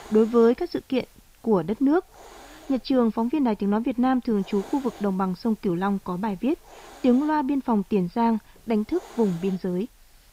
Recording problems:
high frequencies cut off; noticeable; nothing above 5.5 kHz
hiss; faint; throughout; 25 dB below the speech

